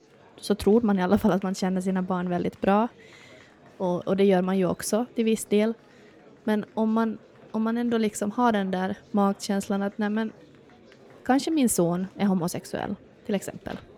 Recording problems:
murmuring crowd; faint; throughout; 25 dB below the speech

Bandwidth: 17.5 kHz